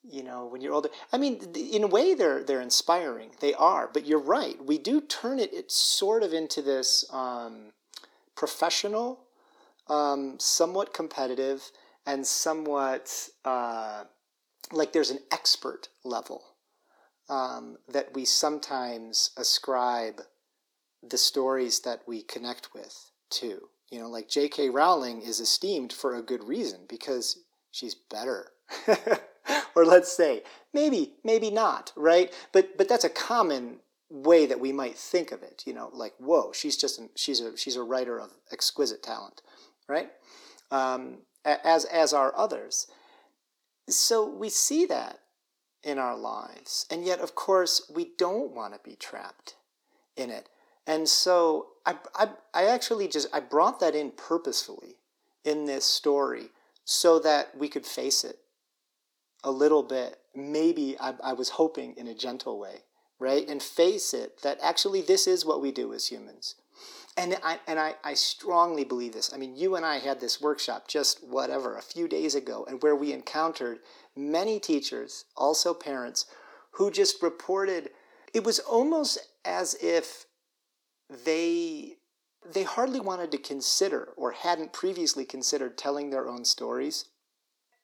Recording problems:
thin; somewhat; fading below 250 Hz

